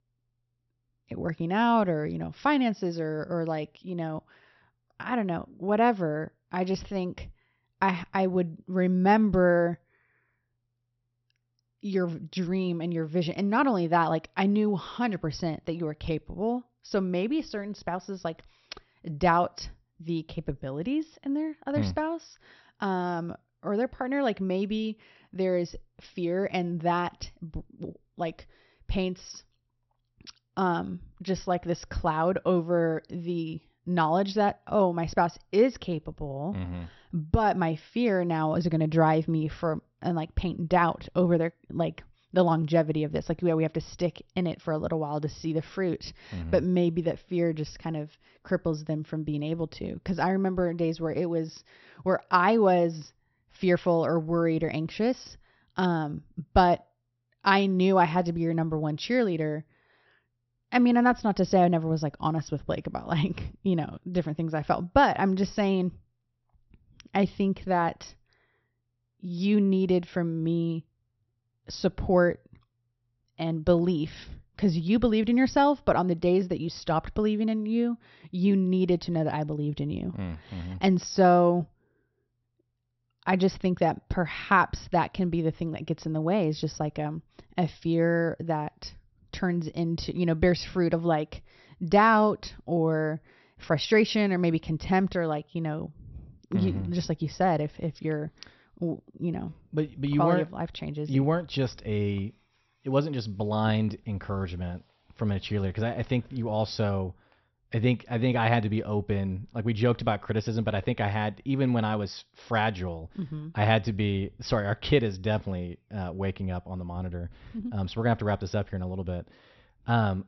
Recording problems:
high frequencies cut off; noticeable; nothing above 6 kHz

